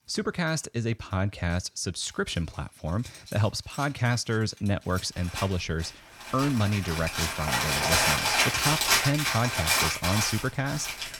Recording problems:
household noises; very loud; throughout; 4 dB above the speech

